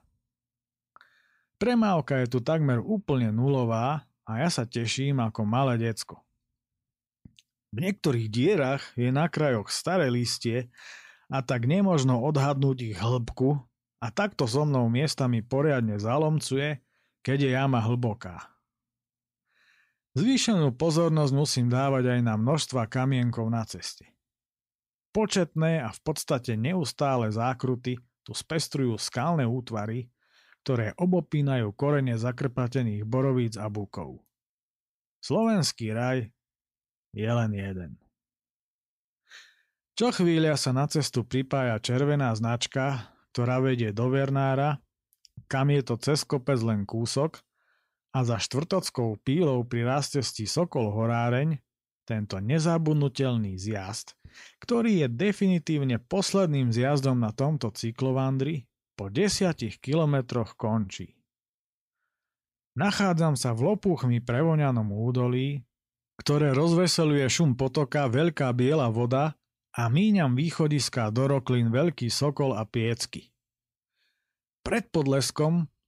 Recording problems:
none

